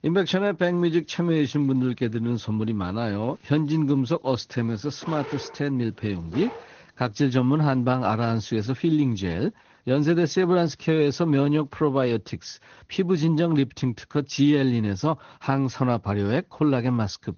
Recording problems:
high frequencies cut off; noticeable; nothing above 6.5 kHz
garbled, watery; slightly
dog barking; faint; from 5 to 7 s; peak 10 dB below the speech

